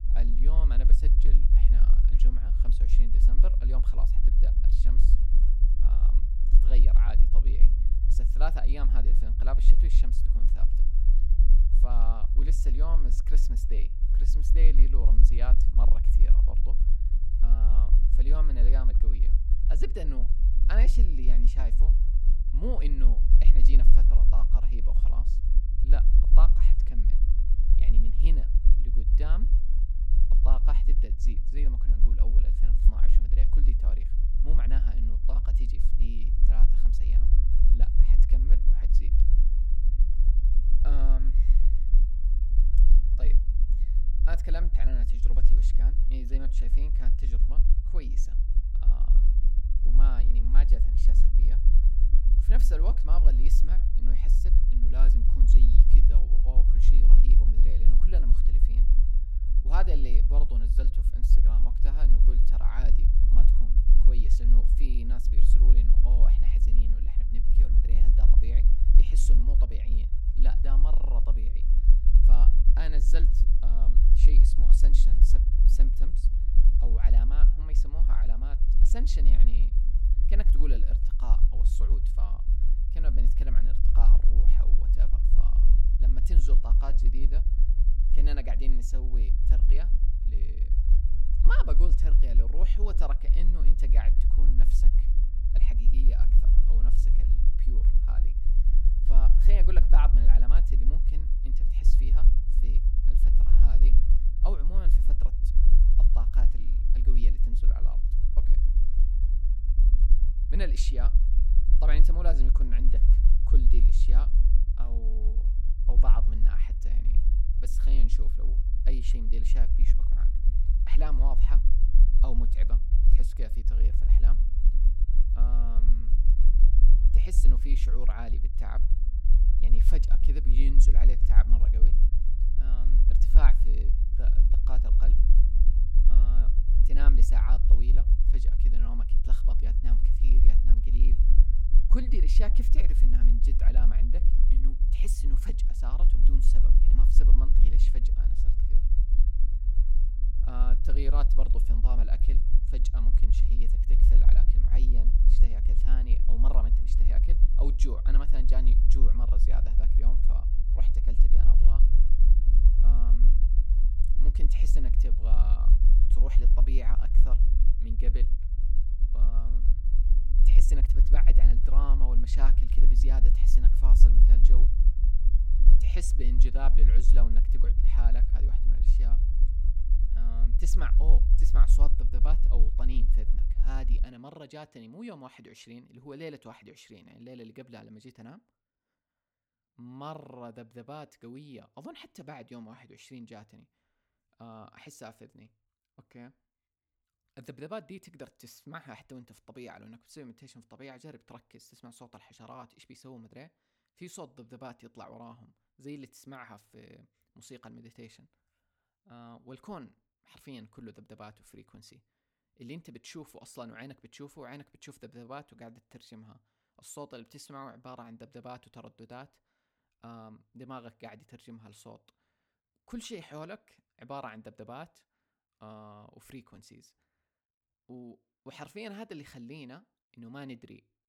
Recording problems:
low rumble; loud; until 3:04; 5 dB below the speech

